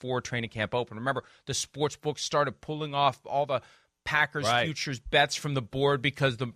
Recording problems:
none

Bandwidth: 14.5 kHz